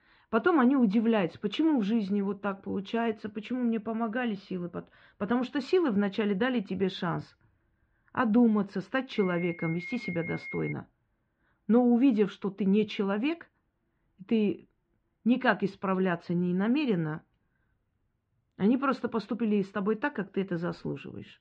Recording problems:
muffled; very; fading above 3 kHz
alarm; faint; from 9 to 11 s; peak 10 dB below the speech

